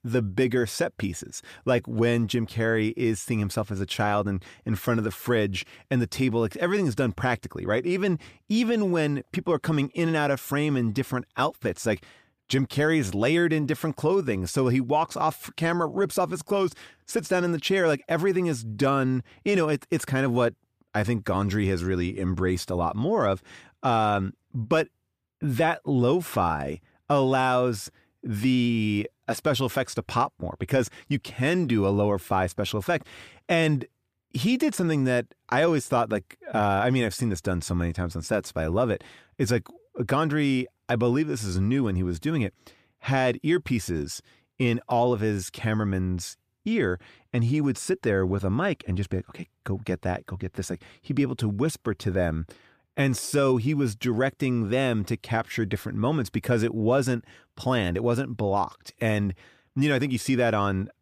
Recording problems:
none

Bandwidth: 15 kHz